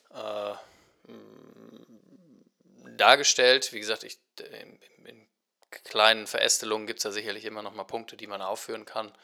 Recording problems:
thin; very; fading below 550 Hz

